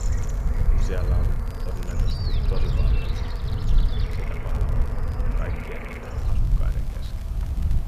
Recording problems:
echo of what is said; faint; throughout; 330 ms later, 20 dB below the speech
animal sounds; very loud; throughout; 2 dB above the speech
wind noise on the microphone; heavy; 2 dB below the speech
hiss; noticeable; throughout; 15 dB below the speech
crackle, like an old record; noticeable; 10 dB below the speech

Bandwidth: 14.5 kHz